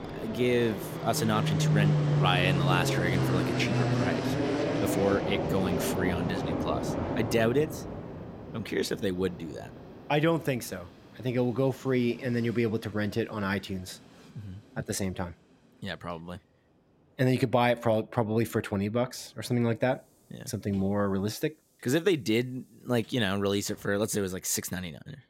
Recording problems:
train or aircraft noise; loud; throughout; as loud as the speech

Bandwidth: 16 kHz